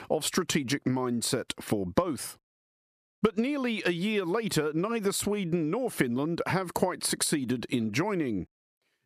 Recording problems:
squashed, flat; somewhat

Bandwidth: 14.5 kHz